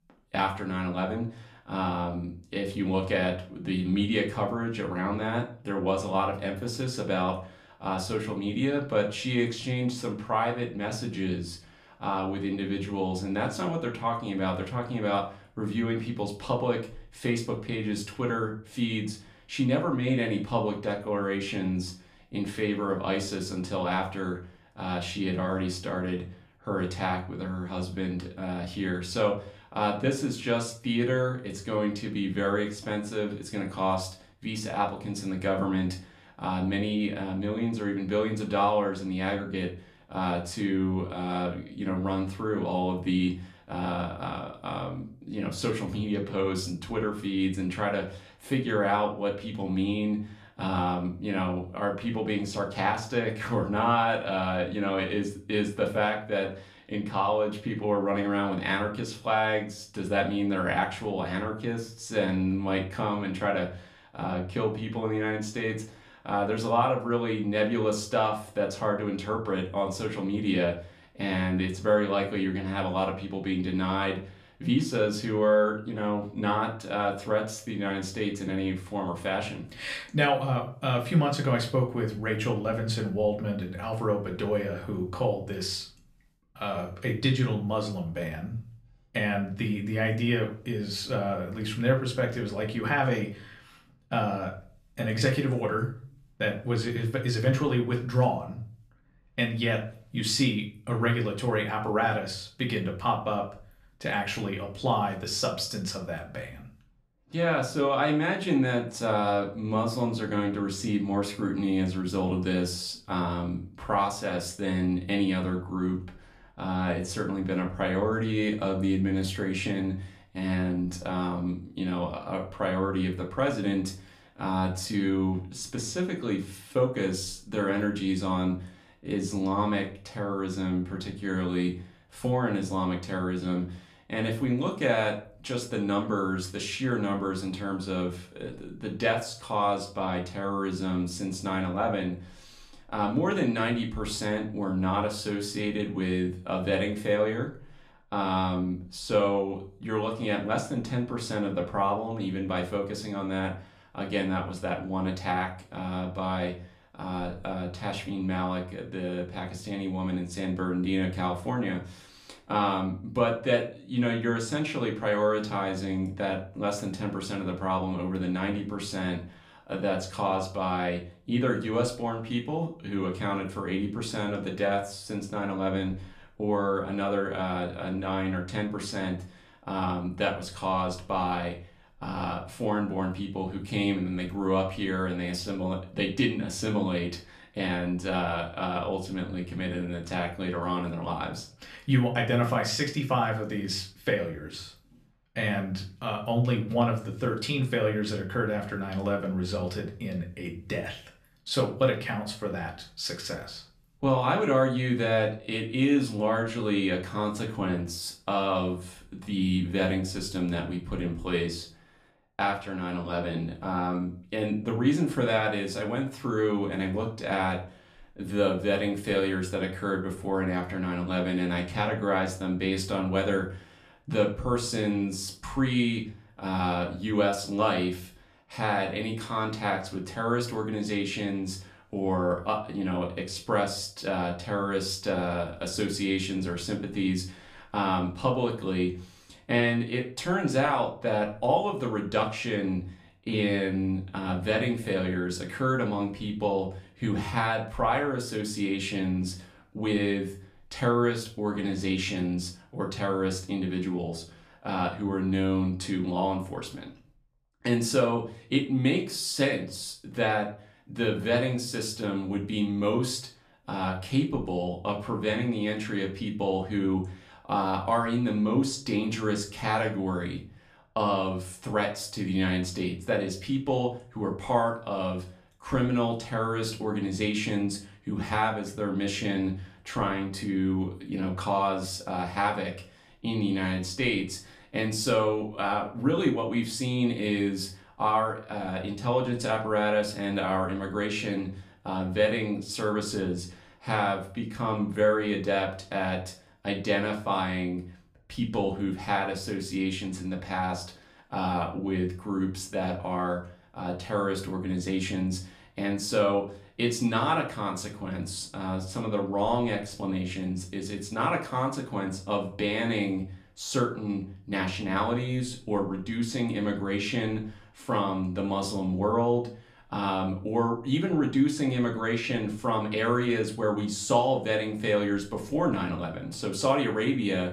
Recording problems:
room echo; slight; dies away in 0.3 s
off-mic speech; somewhat distant

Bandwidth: 14.5 kHz